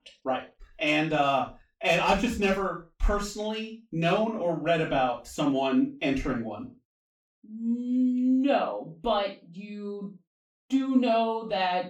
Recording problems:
off-mic speech; far
room echo; slight; dies away in 0.3 s

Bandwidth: 17.5 kHz